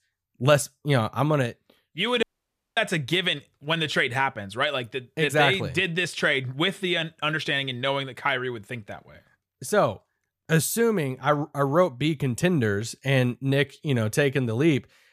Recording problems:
audio cutting out; at 2 s for 0.5 s

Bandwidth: 14.5 kHz